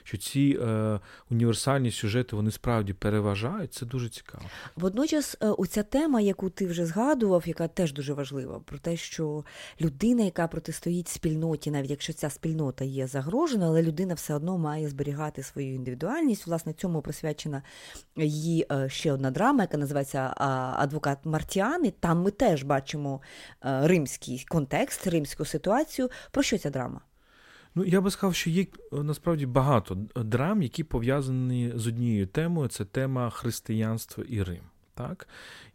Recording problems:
none

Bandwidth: 16 kHz